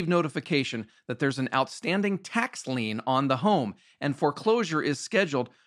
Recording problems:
abrupt cut into speech; at the start

